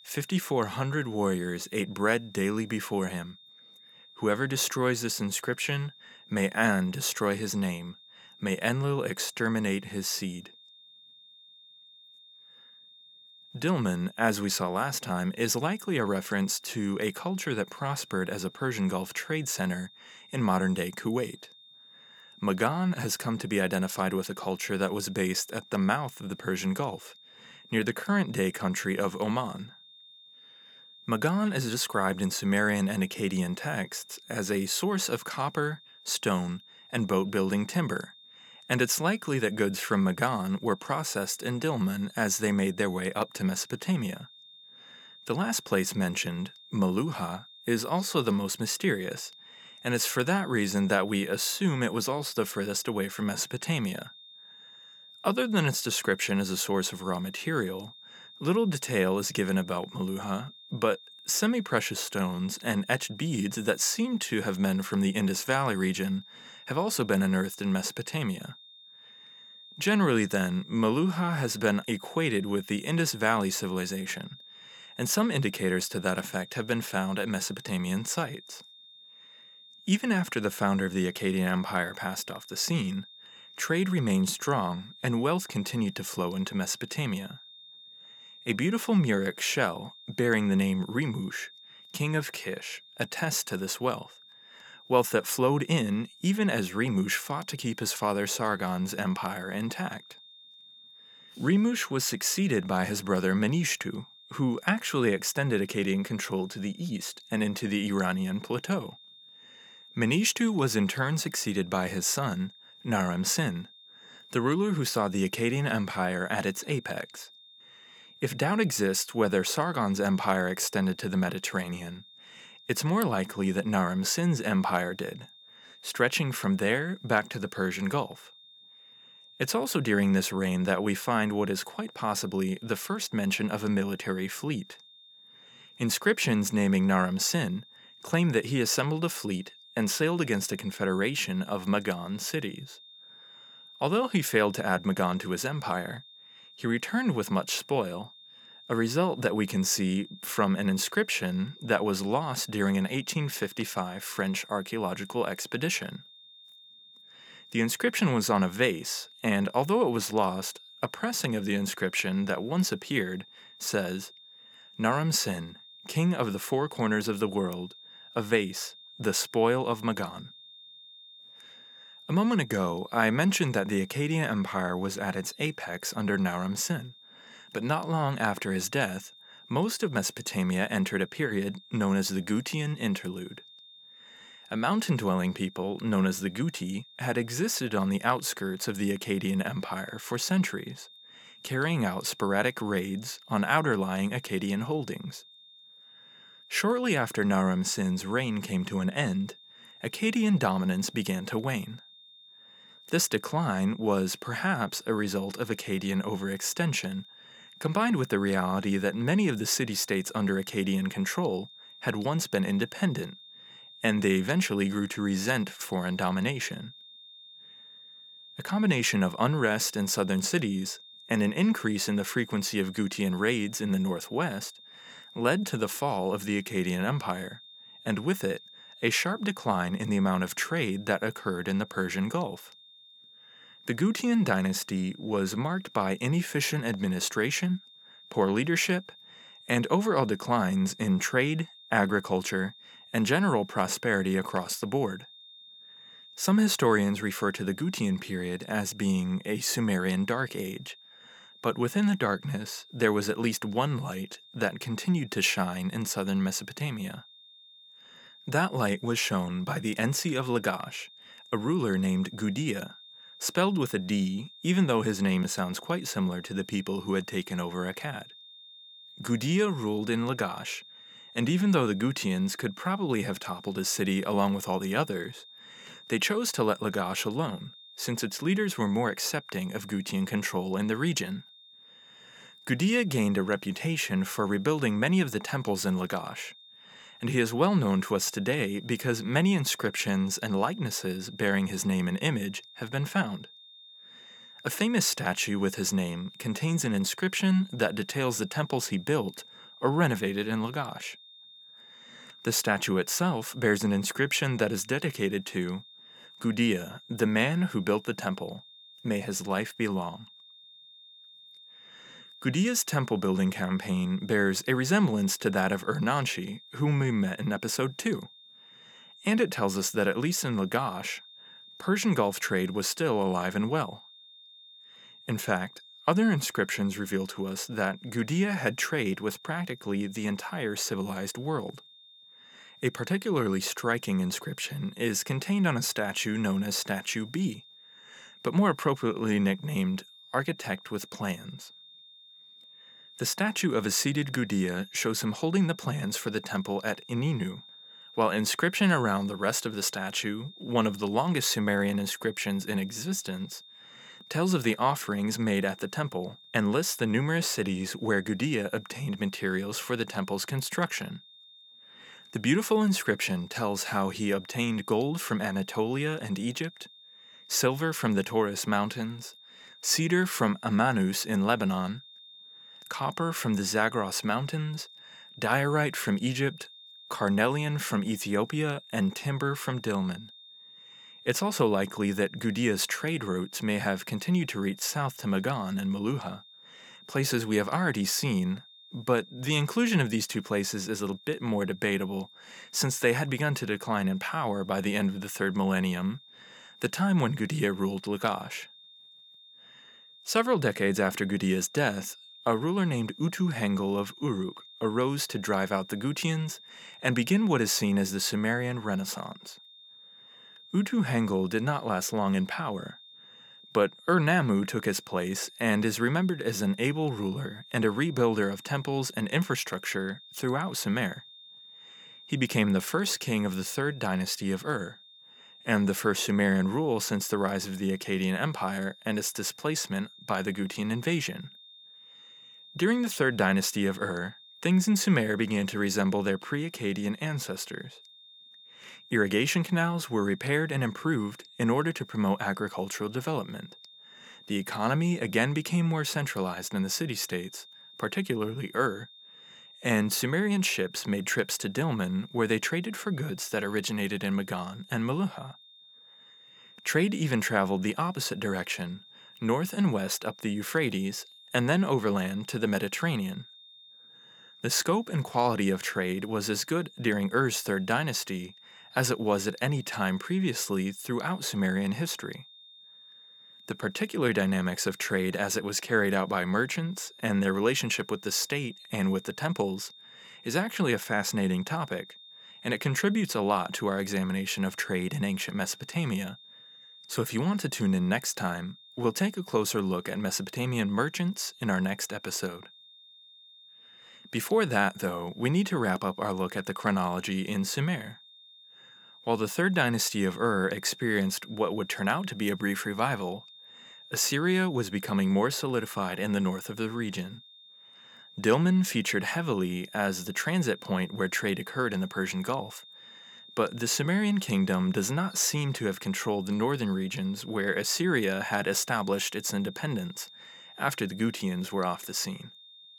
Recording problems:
high-pitched whine; faint; throughout; 3.5 kHz, 20 dB below the speech

